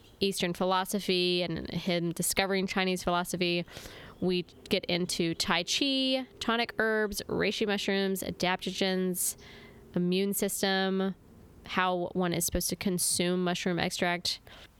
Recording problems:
squashed, flat; somewhat

